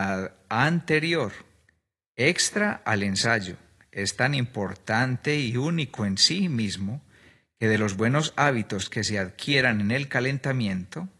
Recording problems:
garbled, watery; slightly
abrupt cut into speech; at the start

